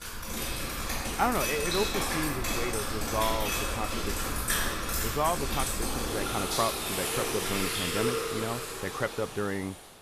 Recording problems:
rain or running water; very loud; throughout; 3 dB above the speech

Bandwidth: 14.5 kHz